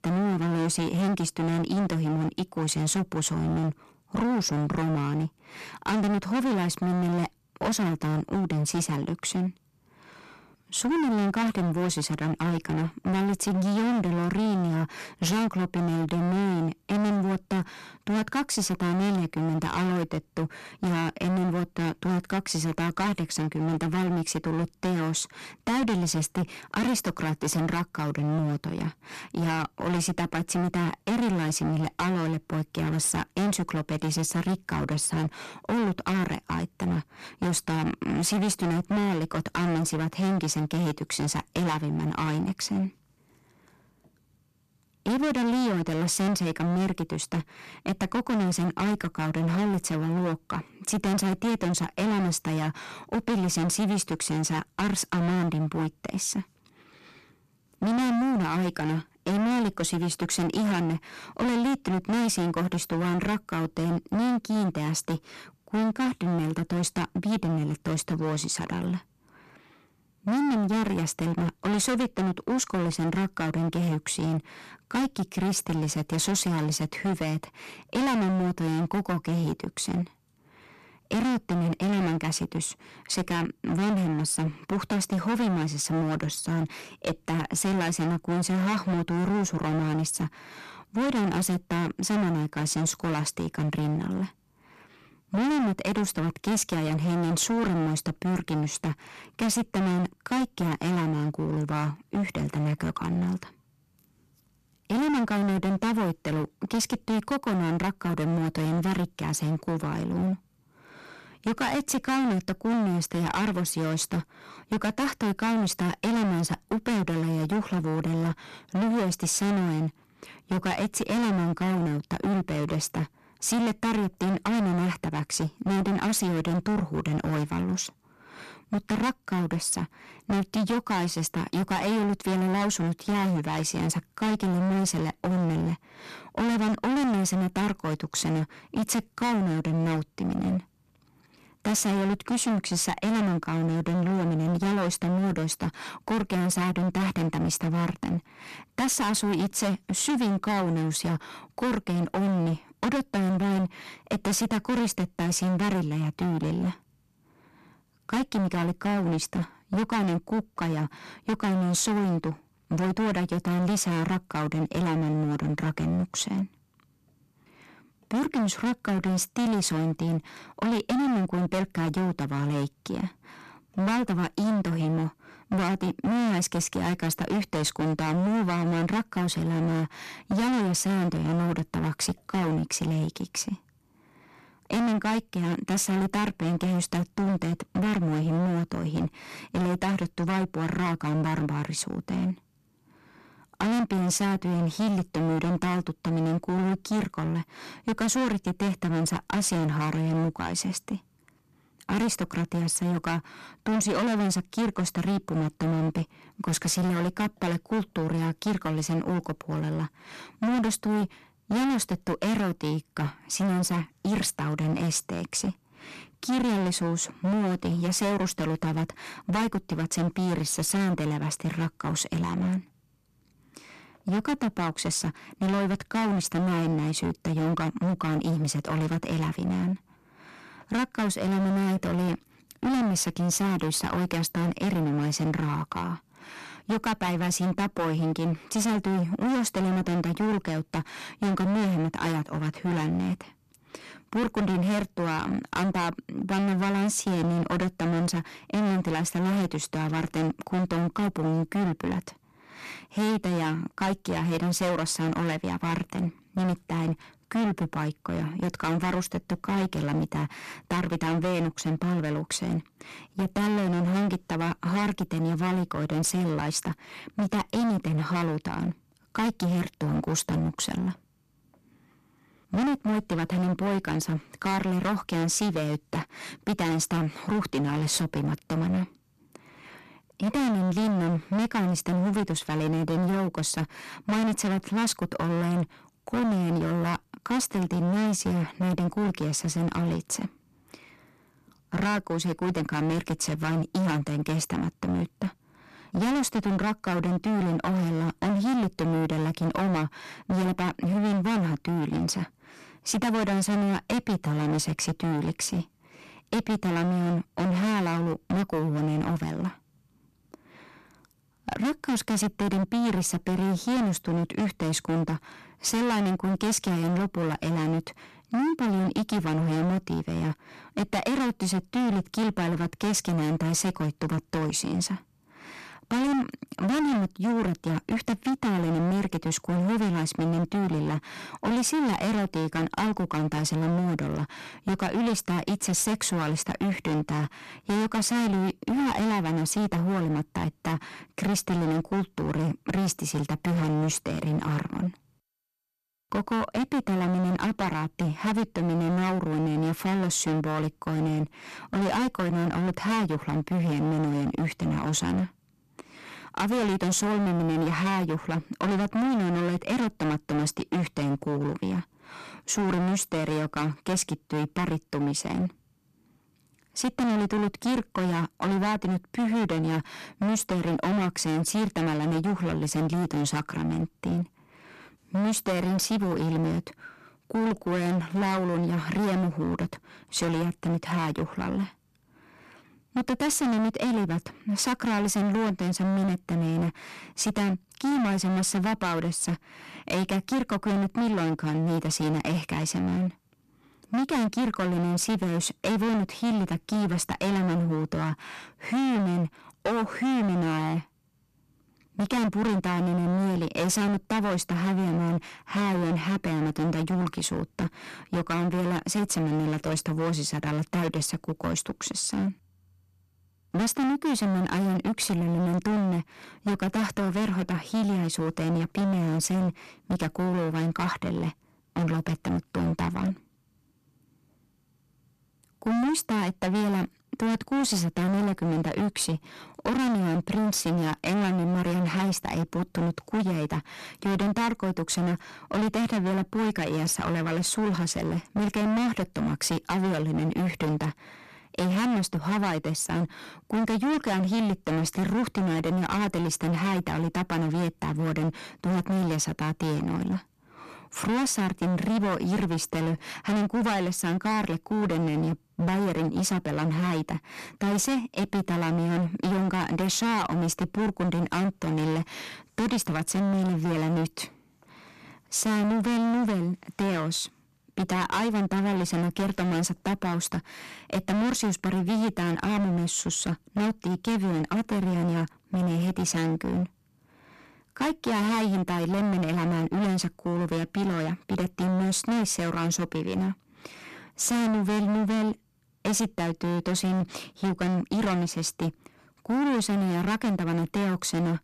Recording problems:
distortion; heavy; 27% of the sound clipped

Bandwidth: 13.5 kHz